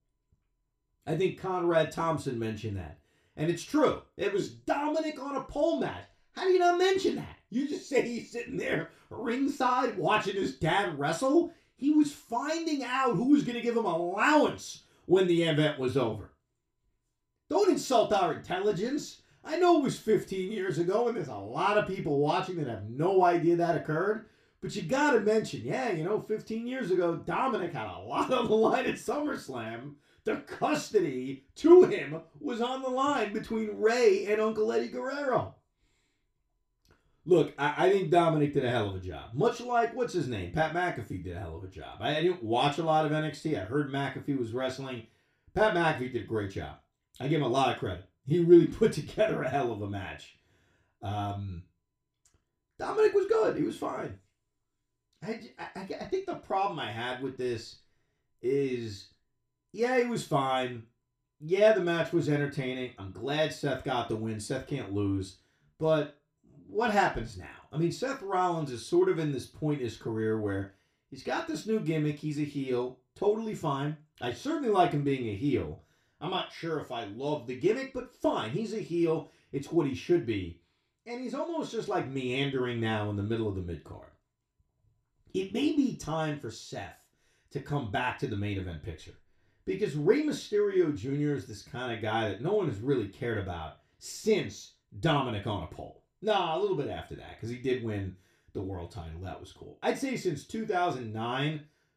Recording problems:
room echo; very slight; dies away in 0.3 s
off-mic speech; somewhat distant

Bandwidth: 15 kHz